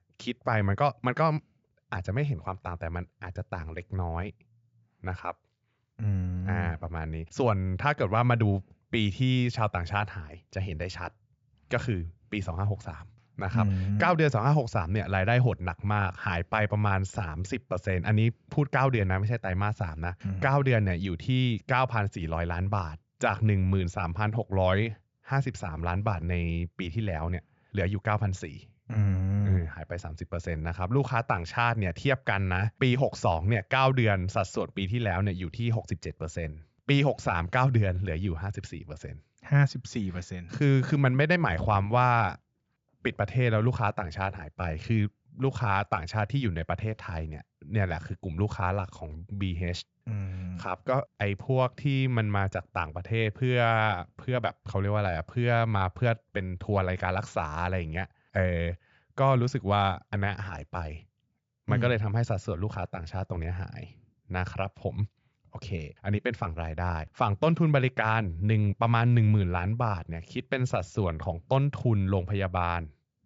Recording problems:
high frequencies cut off; noticeable; nothing above 7.5 kHz

